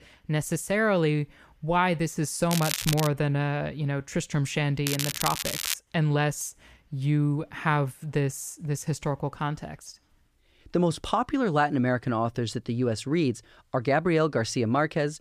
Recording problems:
crackling; loud; at 2.5 s and at 5 s; 3 dB below the speech

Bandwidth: 14.5 kHz